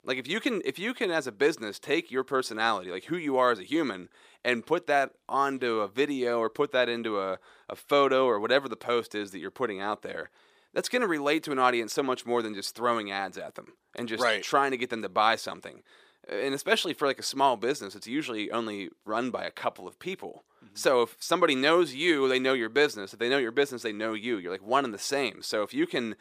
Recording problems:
thin; somewhat; fading below 350 Hz

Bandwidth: 15 kHz